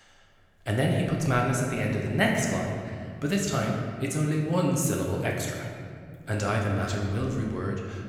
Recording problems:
room echo; noticeable; dies away in 1.9 s
off-mic speech; somewhat distant

